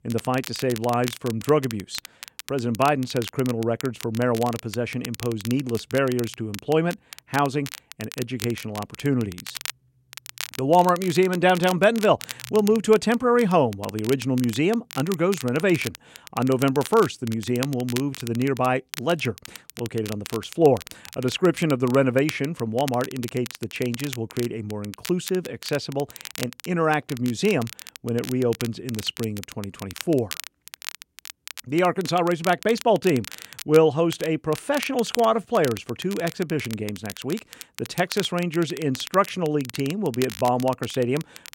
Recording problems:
crackle, like an old record; noticeable; 15 dB below the speech

